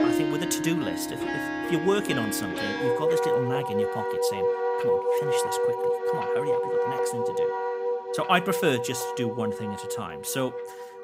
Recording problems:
background music; very loud; throughout; 3 dB above the speech

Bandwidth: 15.5 kHz